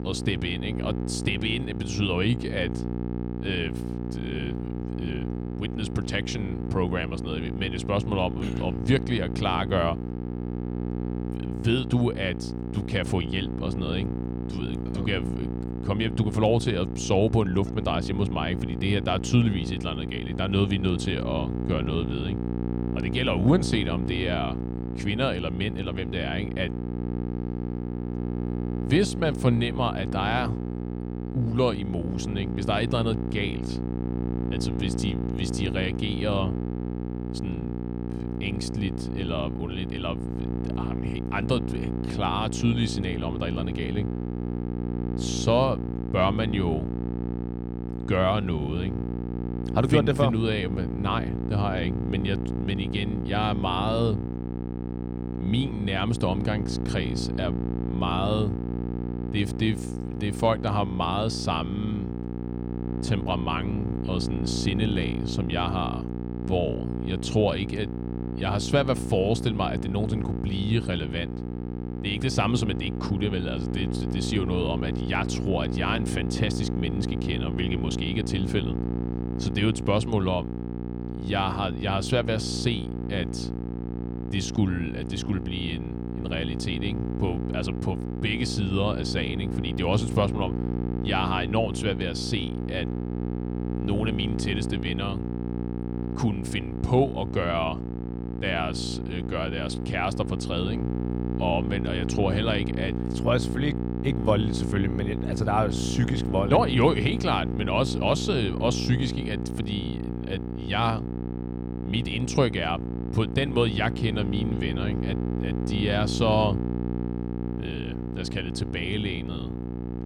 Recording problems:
electrical hum; loud; throughout; 60 Hz, 7 dB below the speech

